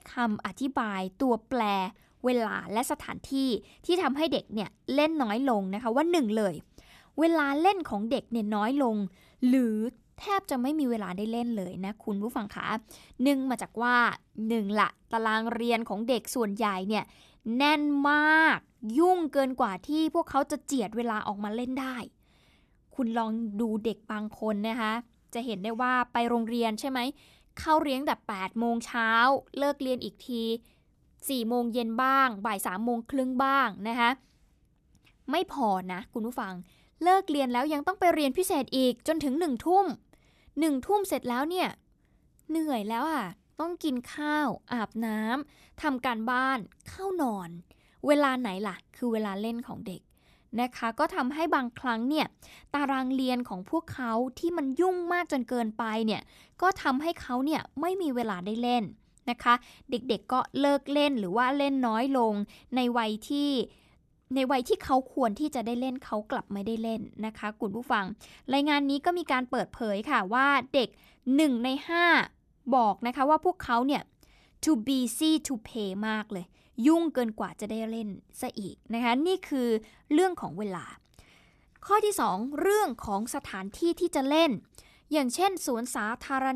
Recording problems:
abrupt cut into speech; at the end

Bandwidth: 14 kHz